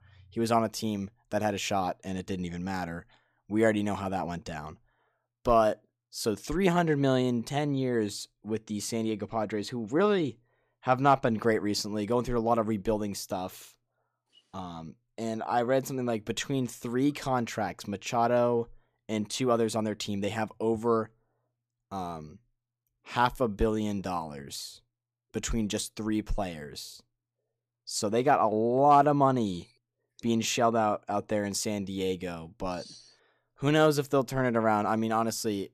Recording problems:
none

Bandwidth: 14.5 kHz